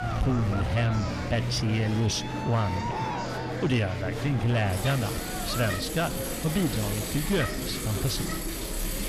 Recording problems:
distortion; slight; 10 dB below the speech
traffic noise; loud; throughout; 6 dB below the speech
murmuring crowd; loud; throughout; 6 dB below the speech

